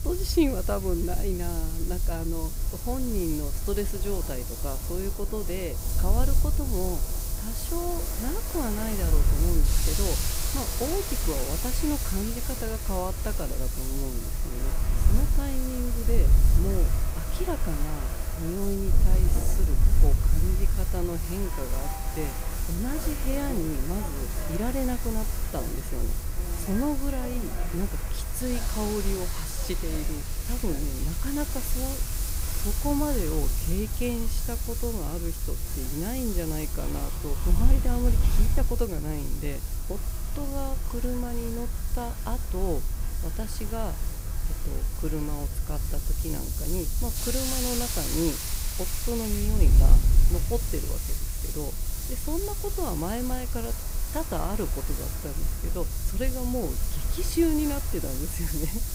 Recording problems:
hiss; loud; throughout; 3 dB below the speech
train or aircraft noise; noticeable; throughout; 10 dB below the speech
wind noise on the microphone; occasional gusts; 15 dB below the speech

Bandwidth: 15.5 kHz